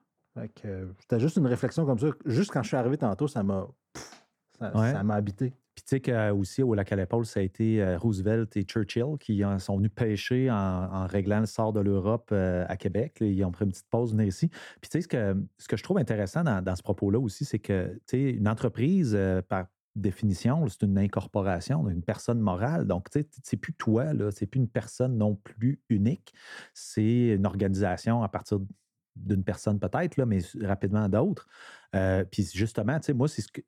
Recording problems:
muffled; slightly; fading above 2.5 kHz

